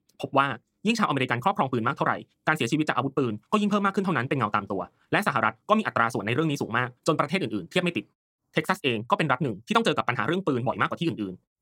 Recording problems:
wrong speed, natural pitch; too fast; 1.6 times normal speed

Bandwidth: 16.5 kHz